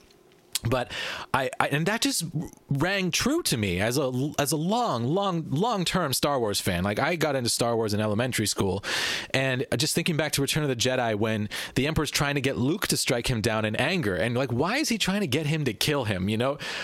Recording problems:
squashed, flat; heavily

